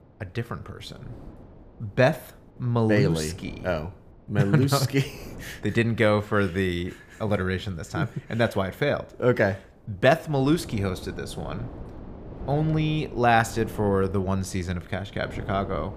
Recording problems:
wind noise on the microphone; occasional gusts; 20 dB below the speech

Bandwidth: 15 kHz